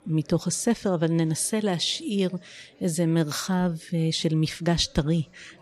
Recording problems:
chatter from many people; faint; throughout; 30 dB below the speech

